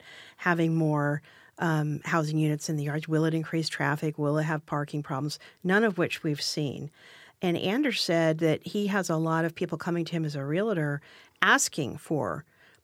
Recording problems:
none

